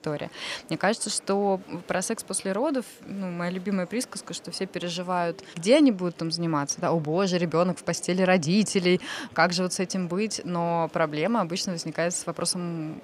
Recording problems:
murmuring crowd; faint; throughout; 25 dB below the speech

